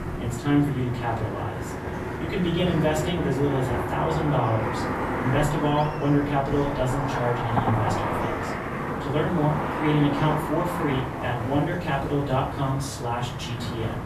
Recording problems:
off-mic speech; far
room echo; slight; dies away in 0.4 s
traffic noise; loud; throughout; 4 dB below the speech
background music; noticeable; until 10 s; 20 dB below the speech
chatter from many people; faint; throughout; 25 dB below the speech

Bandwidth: 14 kHz